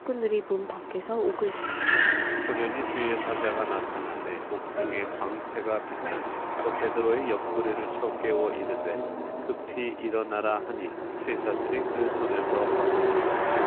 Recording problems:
phone-call audio
traffic noise; very loud; throughout; 2 dB above the speech

